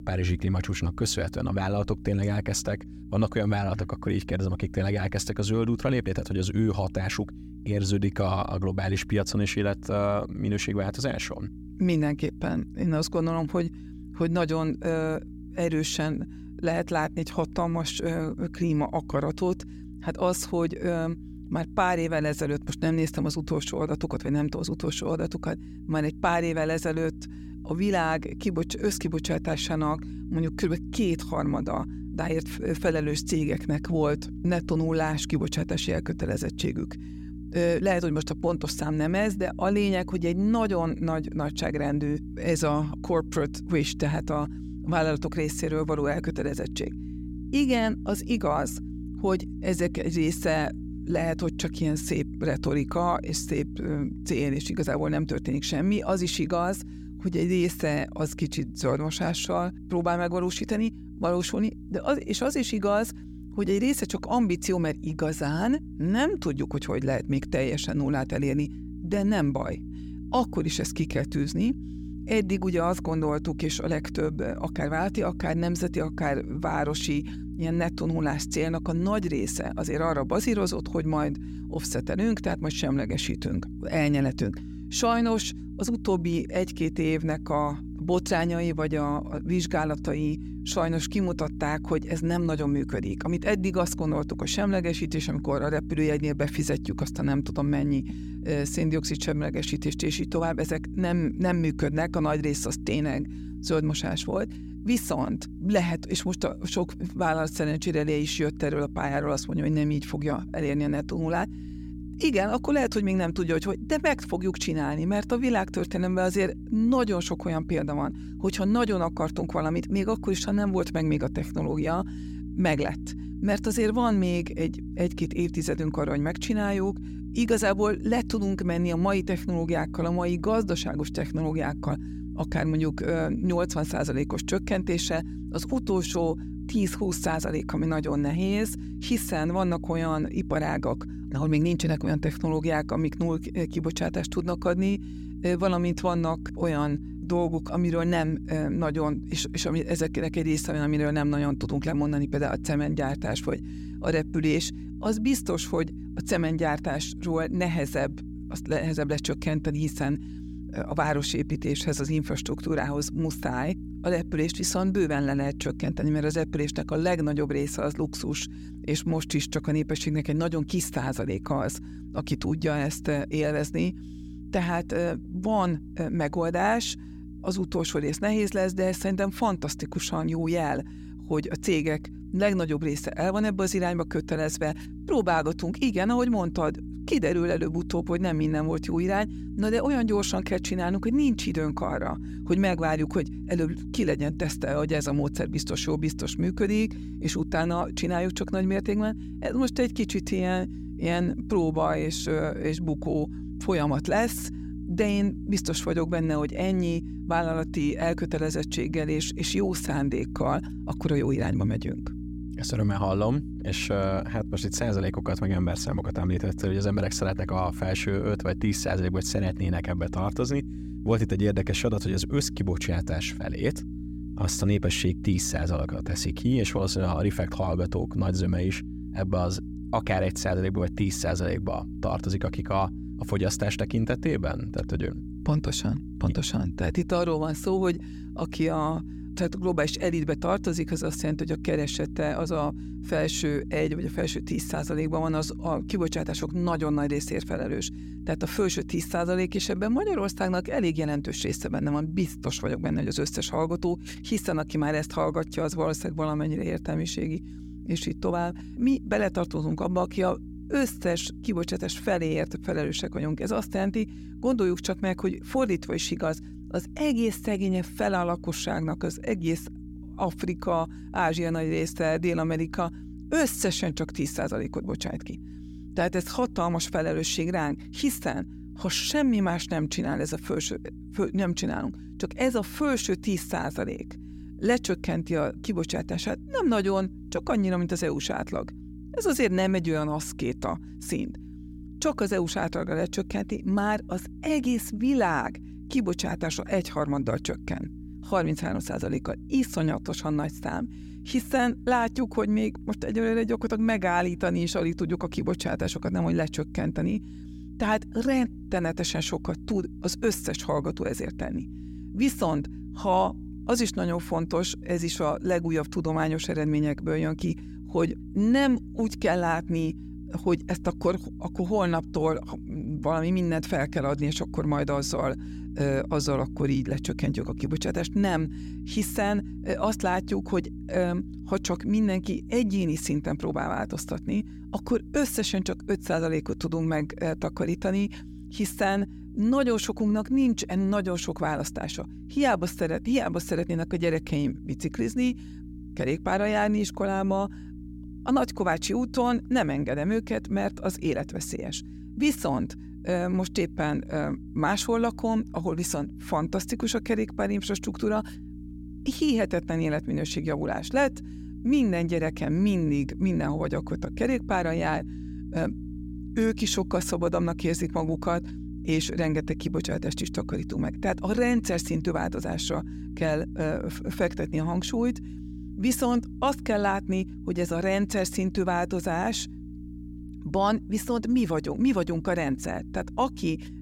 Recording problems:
electrical hum; noticeable; throughout; 60 Hz, 15 dB below the speech

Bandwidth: 16 kHz